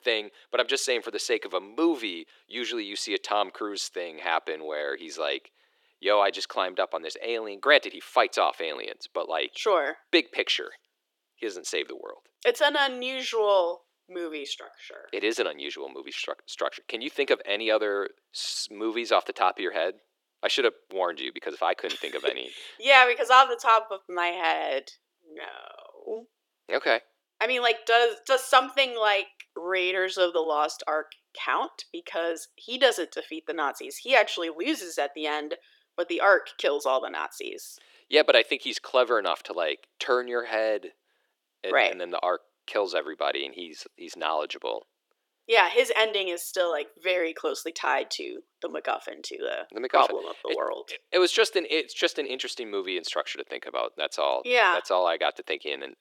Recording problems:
thin; very; fading below 350 Hz

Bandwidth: 17.5 kHz